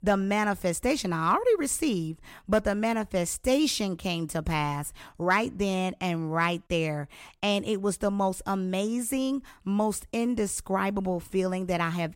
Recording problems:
none

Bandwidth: 16 kHz